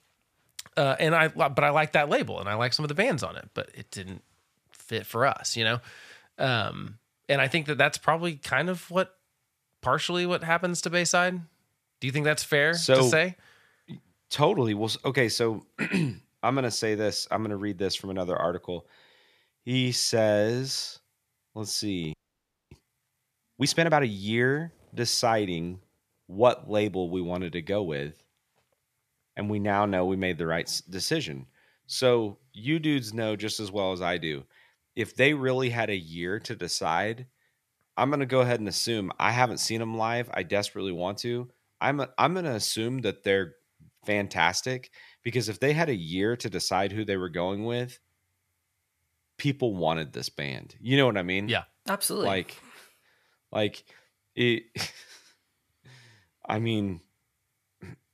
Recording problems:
audio freezing; at 22 s for 0.5 s

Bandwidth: 14.5 kHz